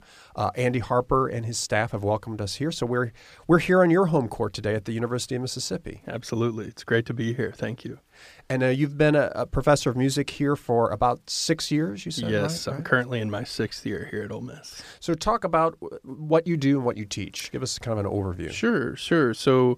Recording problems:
none

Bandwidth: 15 kHz